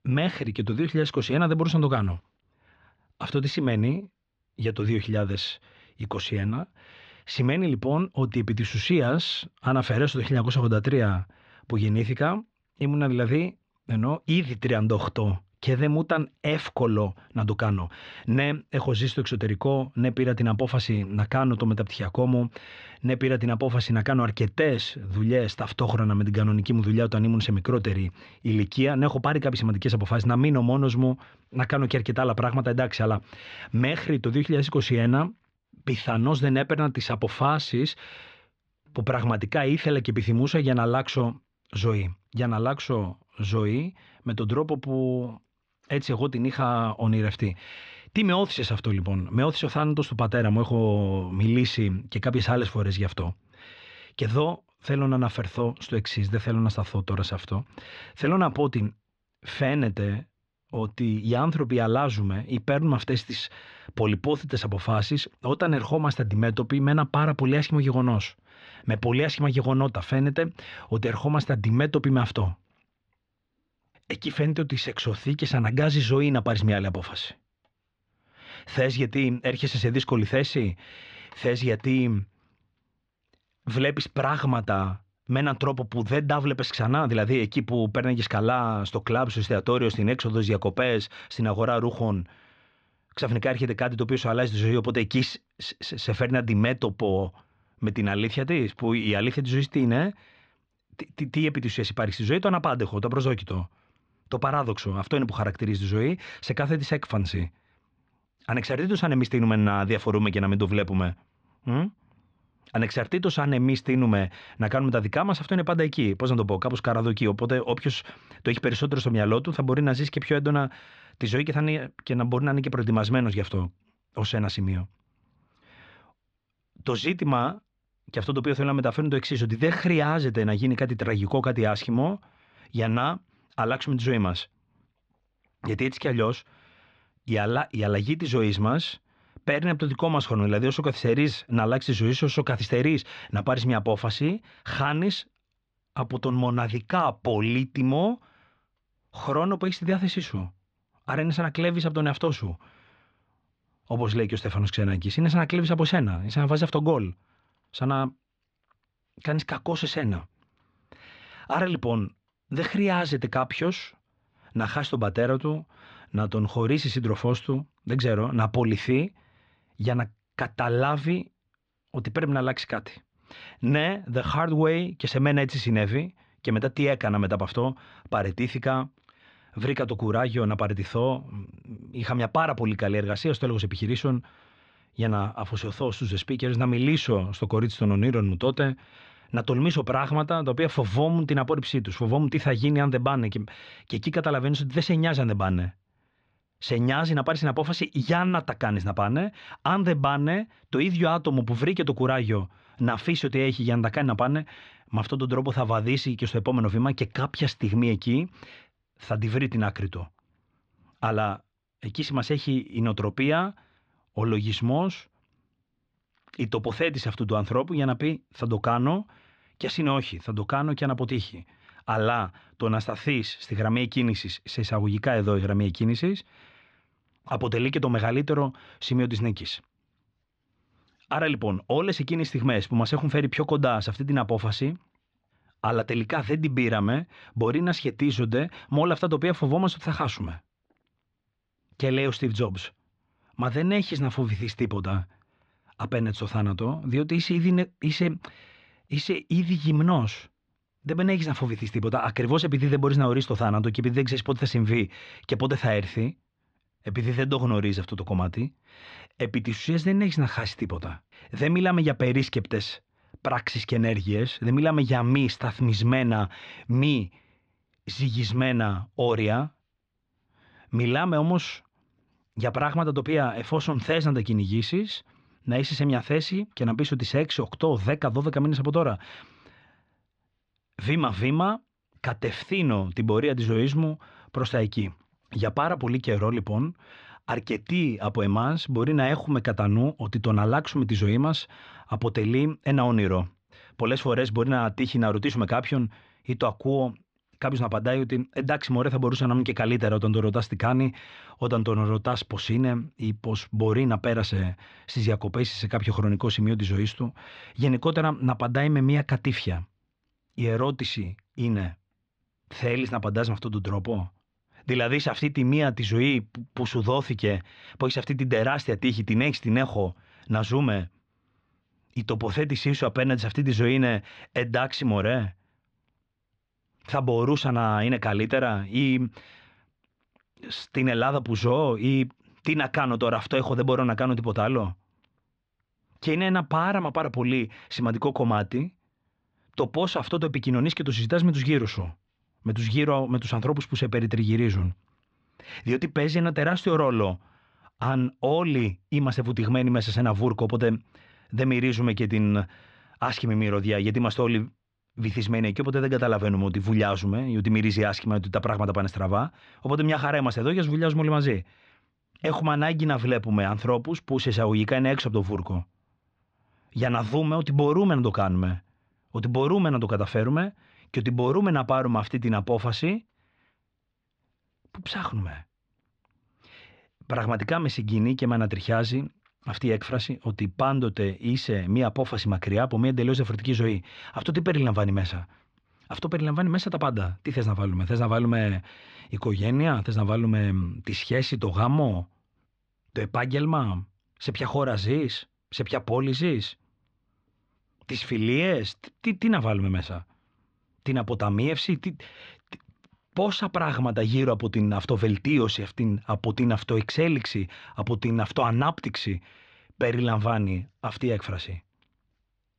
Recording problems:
muffled; slightly; fading above 4 kHz

